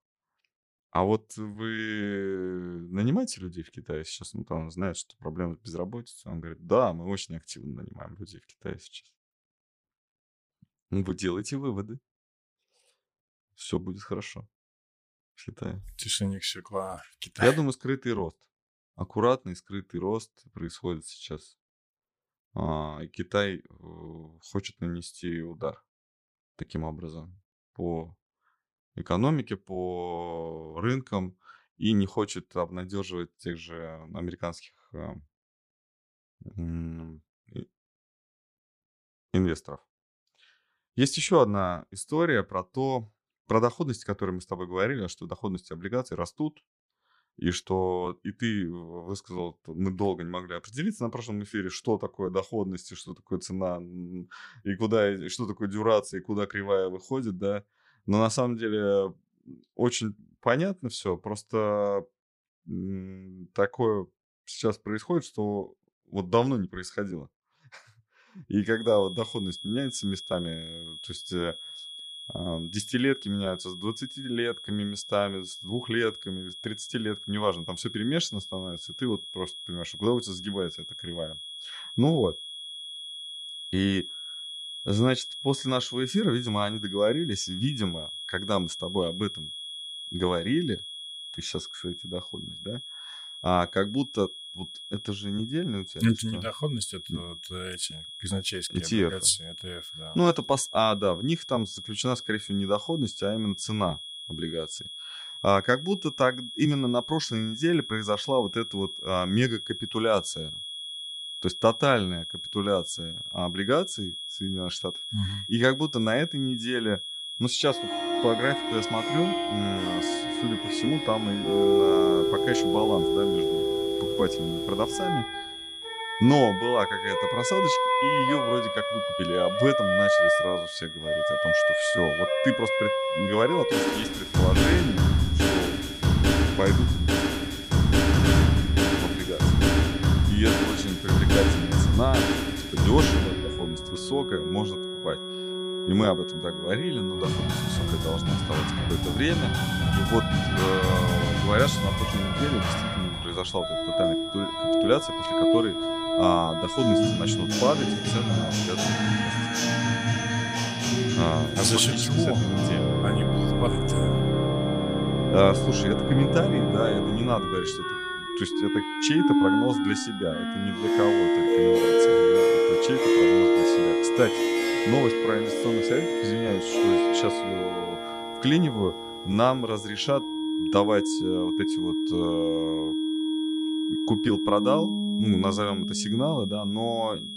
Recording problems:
background music; very loud; from 1:58 on; 4 dB above the speech
high-pitched whine; loud; from 1:09 on; 3.5 kHz, 7 dB below the speech

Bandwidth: 15 kHz